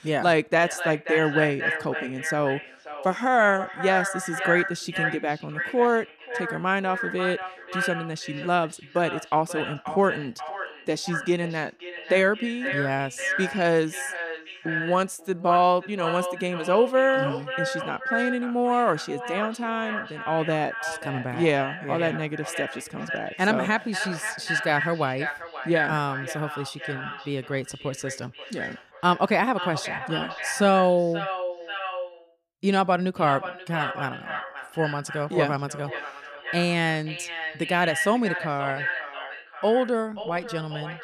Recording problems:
echo of what is said; strong; throughout; 530 ms later, 6 dB below the speech

